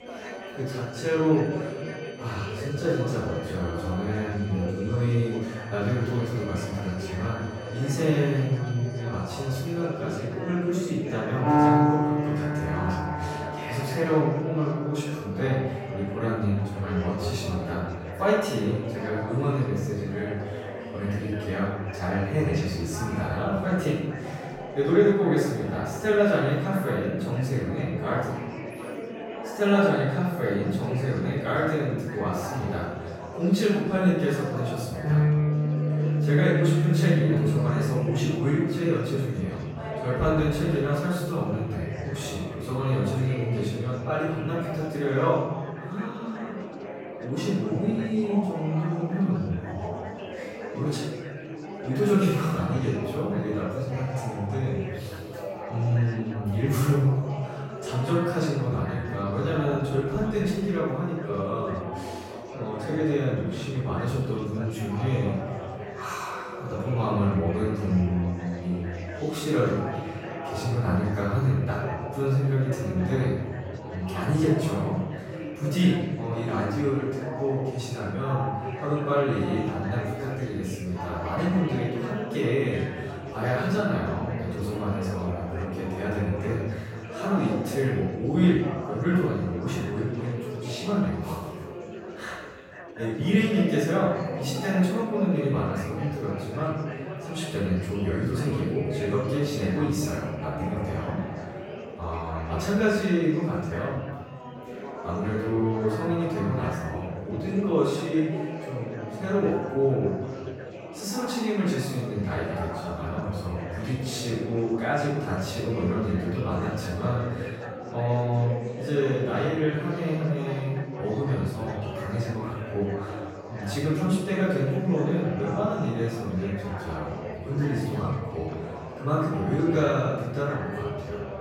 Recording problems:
room echo; strong; dies away in 1.1 s
off-mic speech; far
background music; loud; throughout; 2 dB below the speech
chatter from many people; loud; throughout; 10 dB below the speech

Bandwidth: 16 kHz